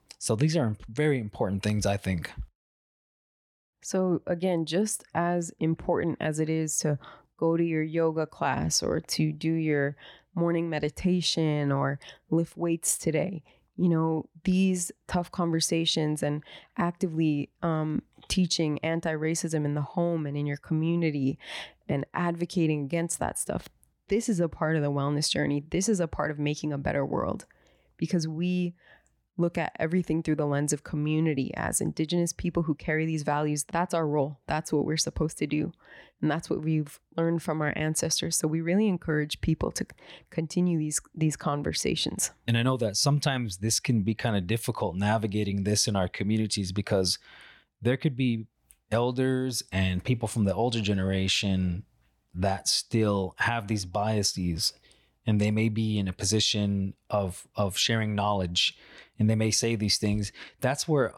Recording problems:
none

